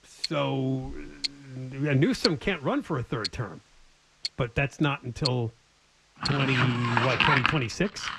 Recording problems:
muffled; slightly; fading above 3 kHz
household noises; loud; throughout; as loud as the speech

